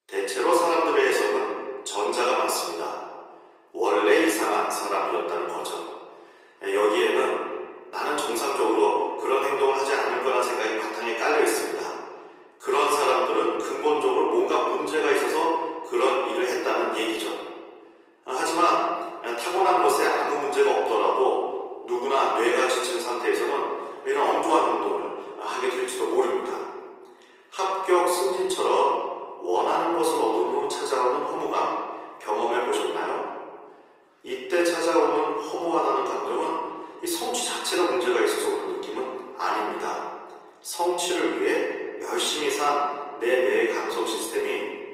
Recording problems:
off-mic speech; far
thin; very; fading below 350 Hz
room echo; noticeable; dies away in 1.5 s
garbled, watery; slightly; nothing above 15.5 kHz

